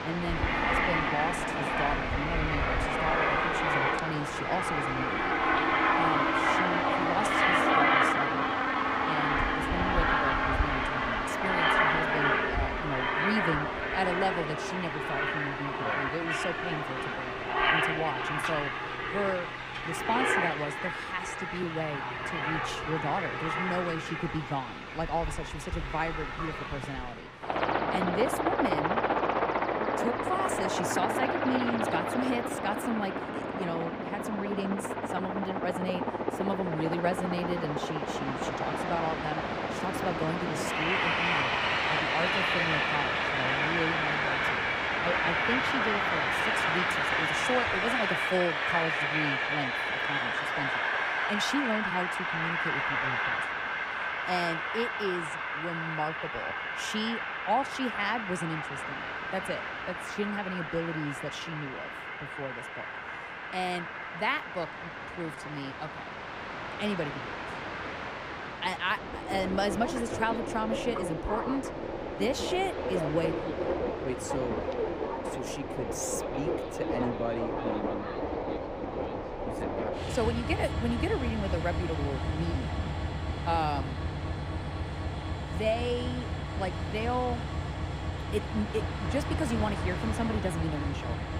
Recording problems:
train or aircraft noise; very loud; throughout; 4 dB above the speech
uneven, jittery; slightly; from 7.5 s to 1:06

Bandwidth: 15.5 kHz